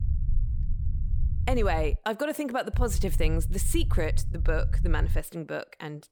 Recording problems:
low rumble; noticeable; until 2 s and from 2.5 to 5 s; 15 dB below the speech

